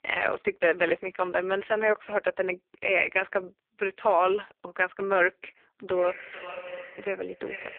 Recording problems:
phone-call audio; poor line
echo of what is said; noticeable; from 6 s on; 440 ms later, 15 dB below the speech

